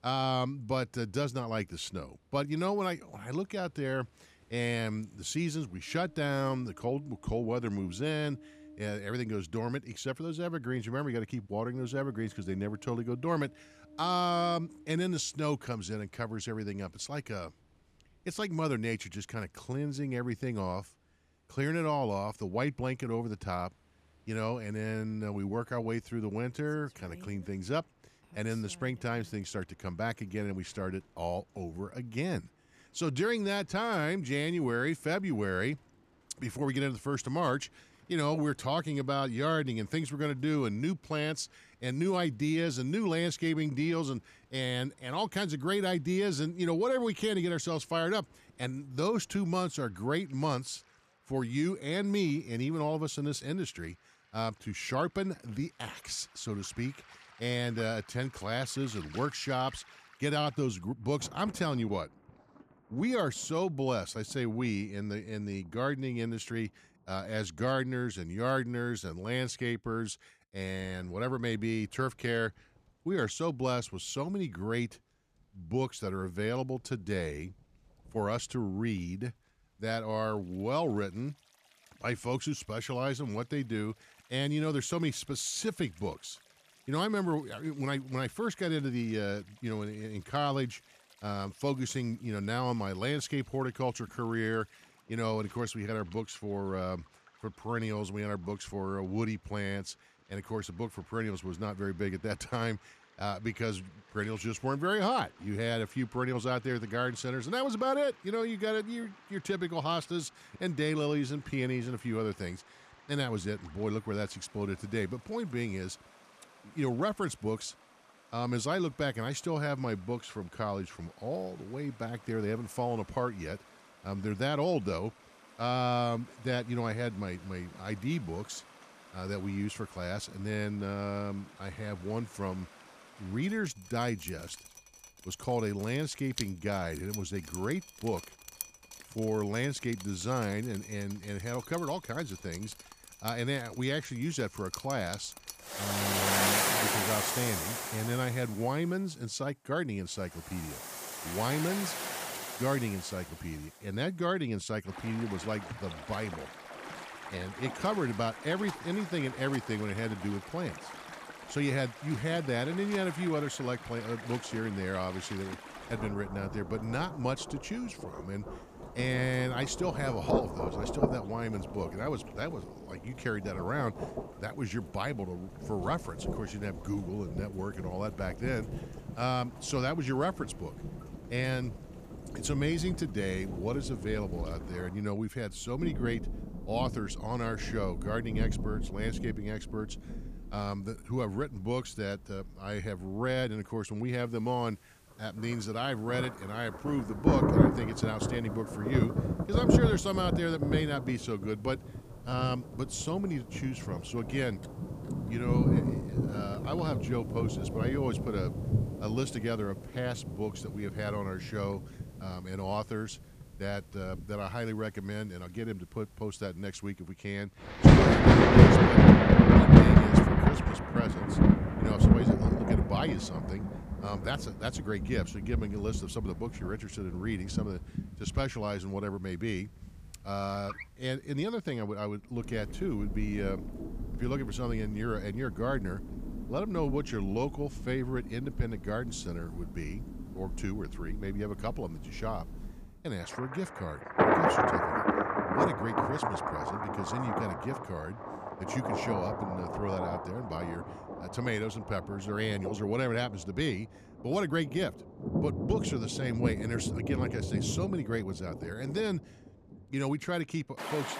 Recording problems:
rain or running water; very loud; throughout; 4 dB above the speech

